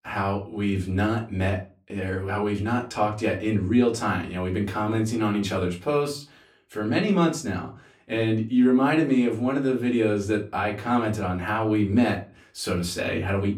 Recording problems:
off-mic speech; far
room echo; very slight; dies away in 0.3 s

